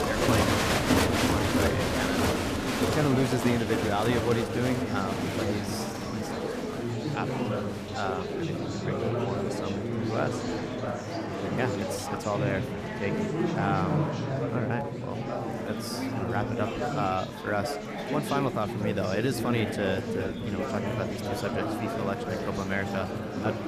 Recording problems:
murmuring crowd; very loud; throughout; 3 dB above the speech

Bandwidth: 14.5 kHz